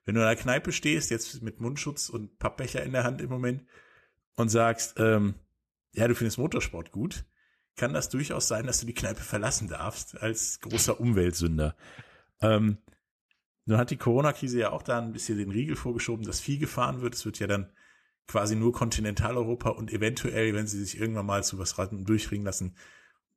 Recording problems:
none

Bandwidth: 13.5 kHz